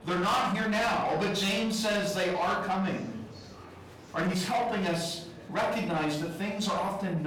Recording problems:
distortion; heavy; 8 dB below the speech
off-mic speech; far
room echo; noticeable; dies away in 0.5 s
murmuring crowd; noticeable; throughout; 20 dB below the speech
abrupt cut into speech; at the end

